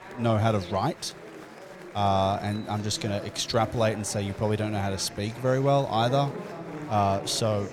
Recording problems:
murmuring crowd; noticeable; throughout; 15 dB below the speech

